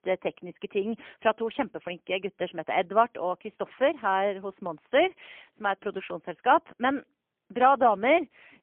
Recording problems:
phone-call audio; poor line; nothing above 3.5 kHz

